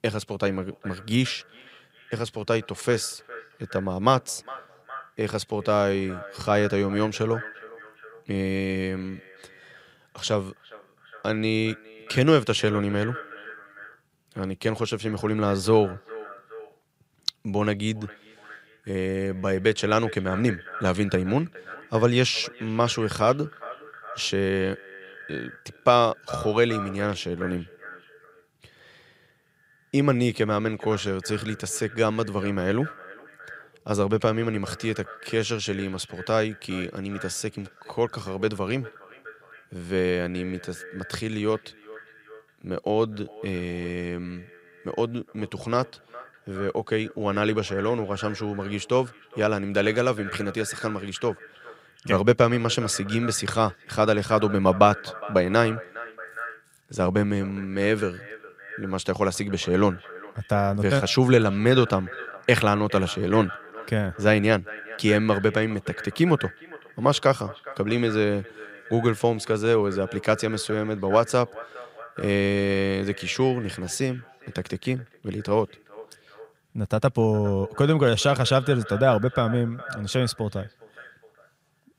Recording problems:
echo of what is said; noticeable; throughout; 410 ms later, 15 dB below the speech

